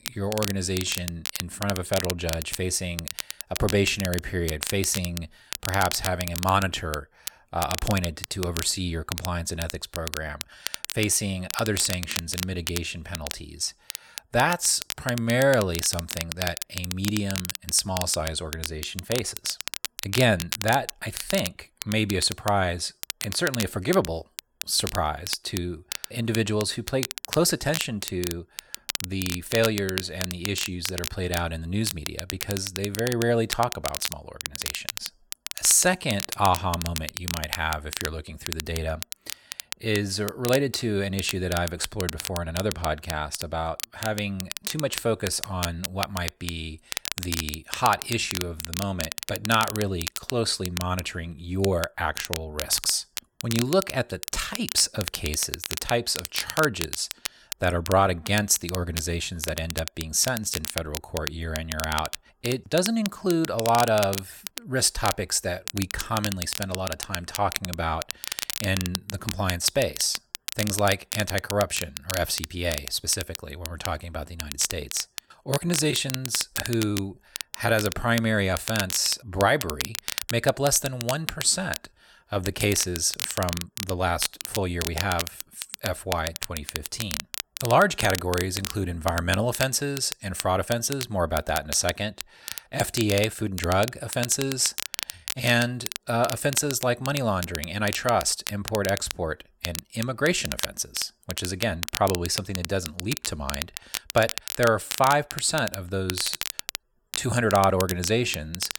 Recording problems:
crackle, like an old record; loud; 7 dB below the speech

